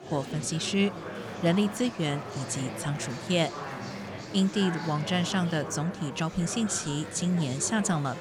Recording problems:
murmuring crowd; loud; throughout; 9 dB below the speech

